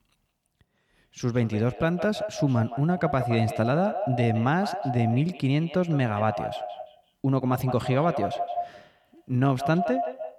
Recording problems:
echo of what is said; strong; throughout; 170 ms later, 8 dB below the speech

